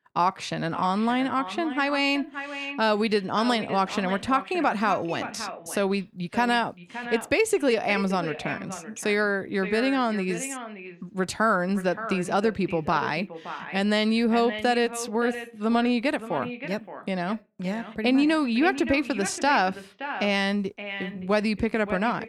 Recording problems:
echo of what is said; strong; throughout; 570 ms later, 10 dB below the speech

